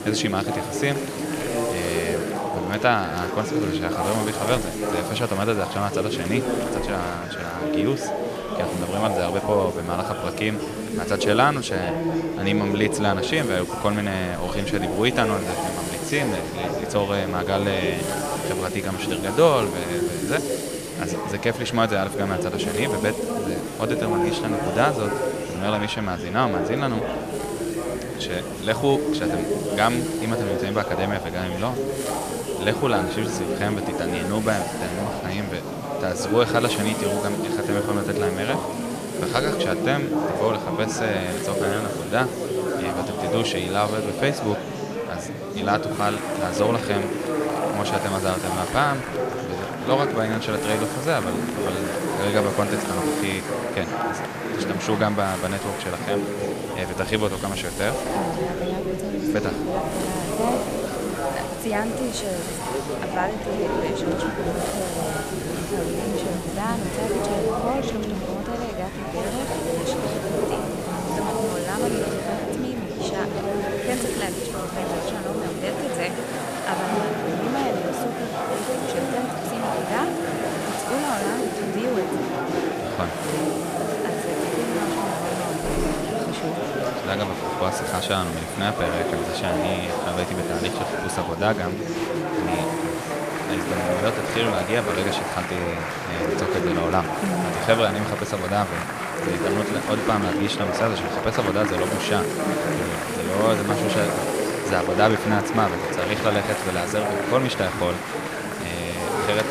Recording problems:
murmuring crowd; loud; throughout; as loud as the speech
hiss; noticeable; throughout; 10 dB below the speech

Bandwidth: 14.5 kHz